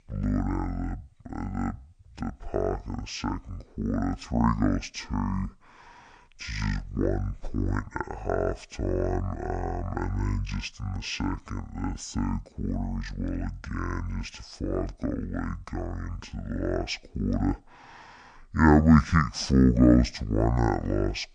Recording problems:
wrong speed and pitch; too slow and too low; 0.6 times normal speed

